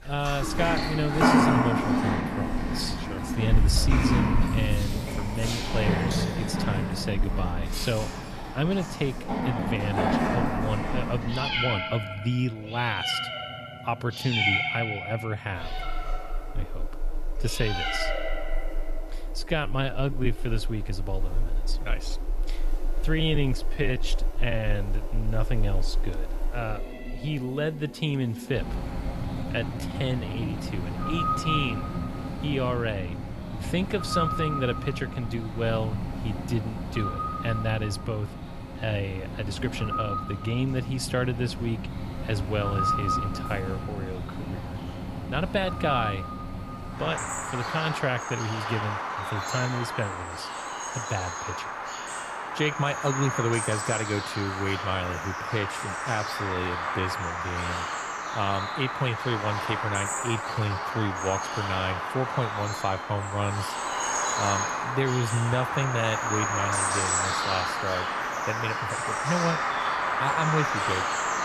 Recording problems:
animal sounds; very loud; throughout; 1 dB above the speech
uneven, jittery; strongly; from 9.5 s to 1:01

